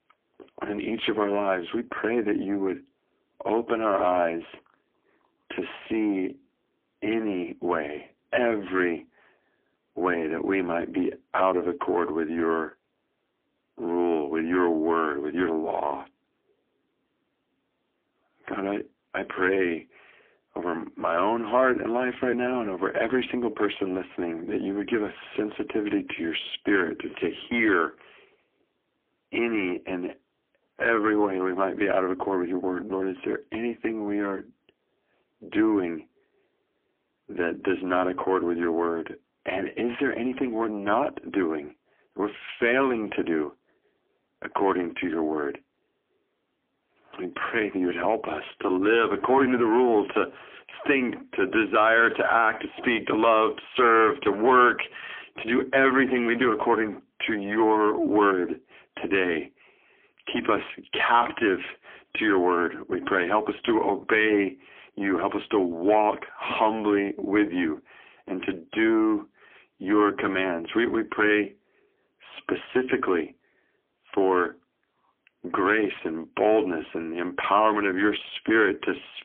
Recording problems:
phone-call audio; poor line; nothing above 3.5 kHz
distortion; slight; 15 dB below the speech

